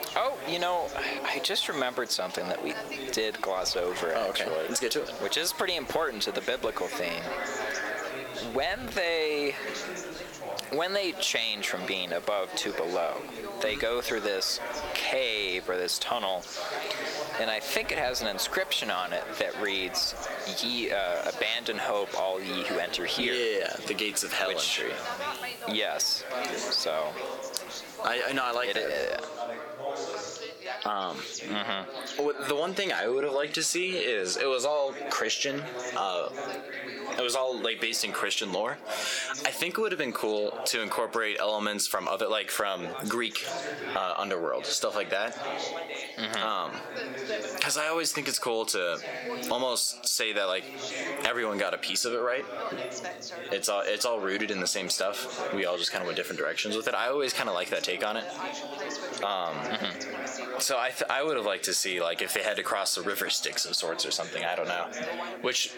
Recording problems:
squashed, flat; heavily, background pumping
thin; very slightly; fading below 450 Hz
background chatter; loud; throughout; 4 voices, 10 dB below the speech
hiss; noticeable; until 29 s; 15 dB below the speech

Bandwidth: 18 kHz